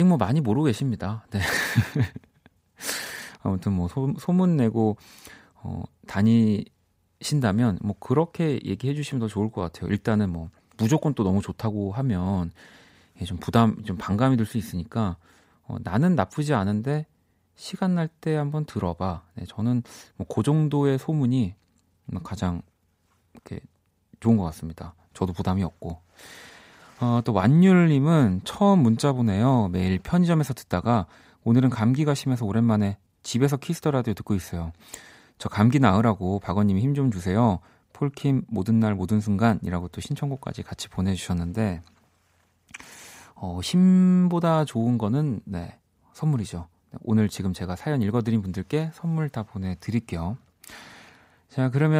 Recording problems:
abrupt cut into speech; at the start and the end

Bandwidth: 15.5 kHz